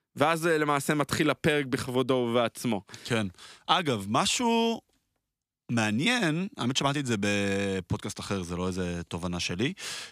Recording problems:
none

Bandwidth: 14.5 kHz